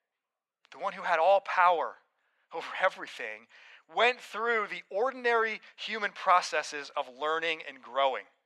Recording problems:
thin; very; fading below 500 Hz

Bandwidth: 13.5 kHz